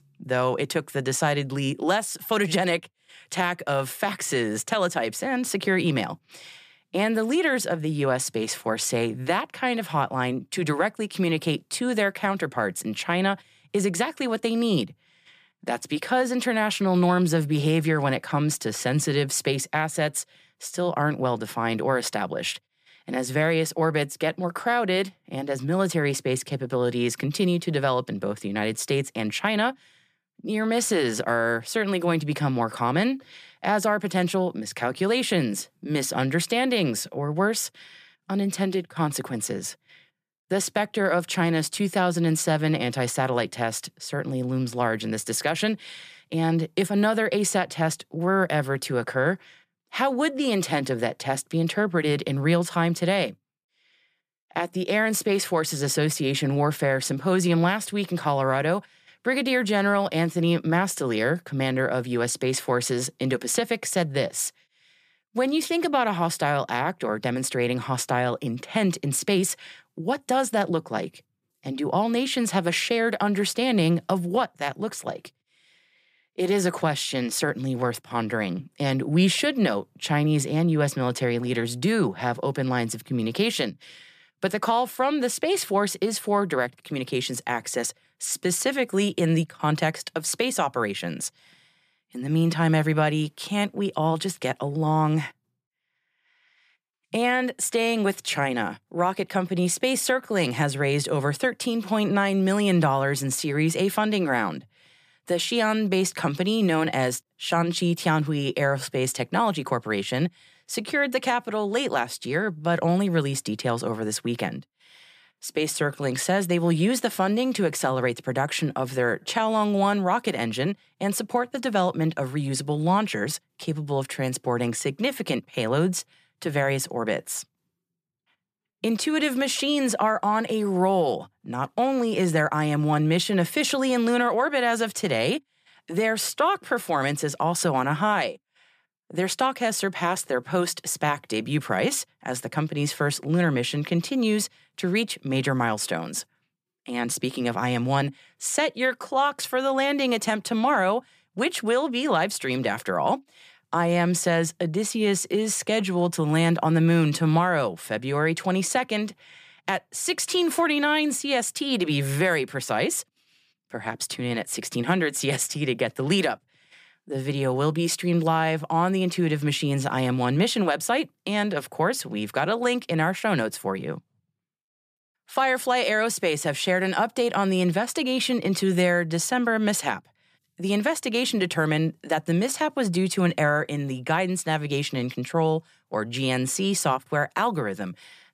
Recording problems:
none

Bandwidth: 14.5 kHz